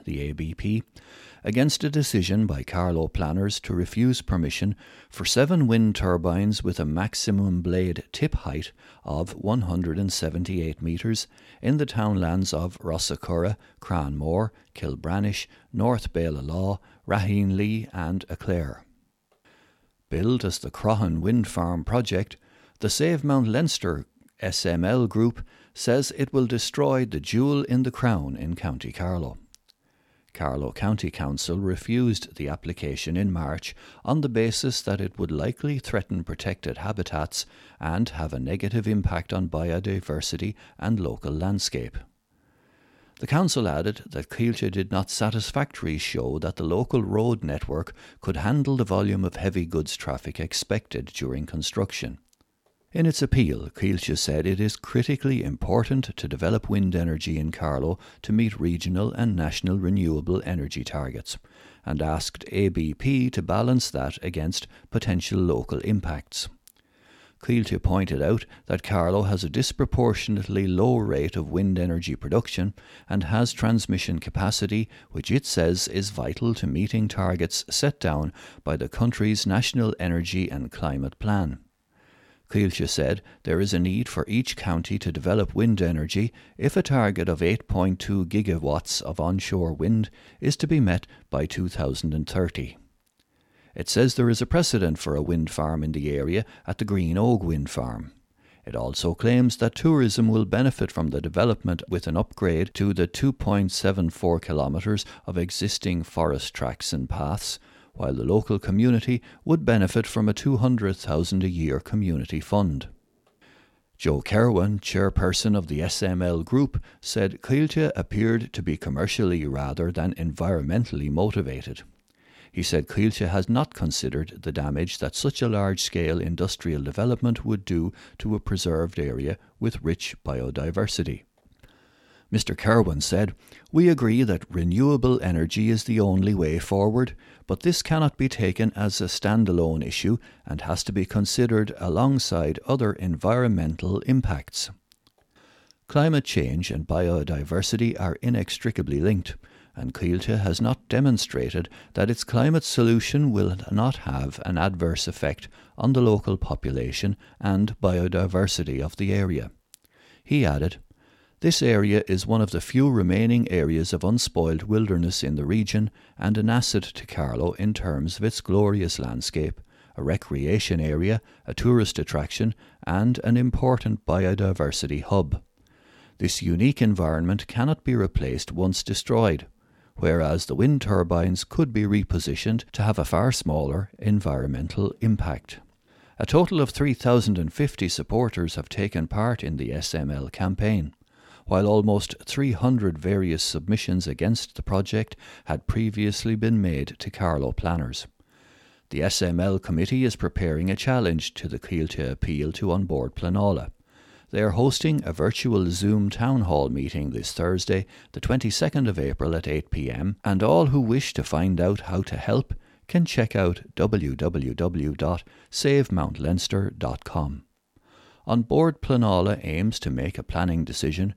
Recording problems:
none

